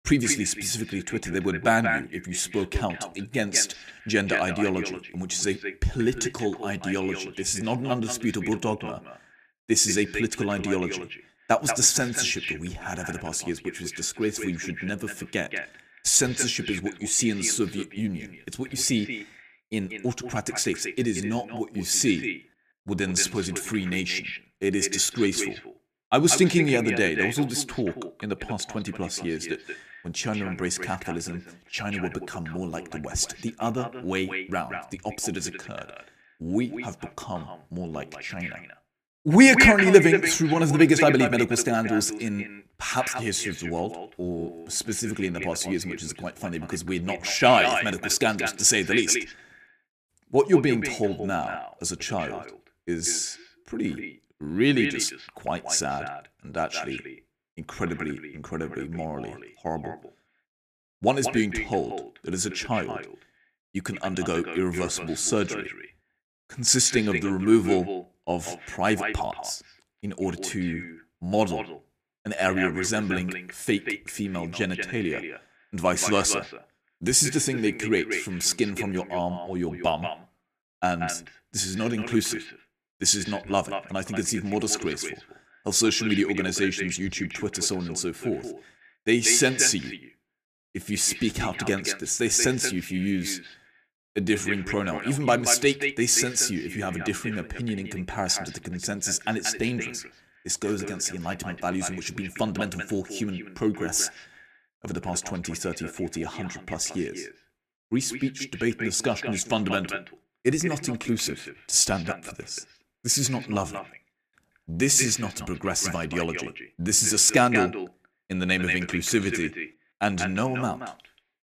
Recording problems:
echo of what is said; strong; throughout; 180 ms later, 8 dB below the speech

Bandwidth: 14.5 kHz